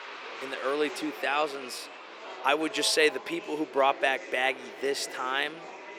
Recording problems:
thin; somewhat; fading below 350 Hz
murmuring crowd; noticeable; throughout; 15 dB below the speech

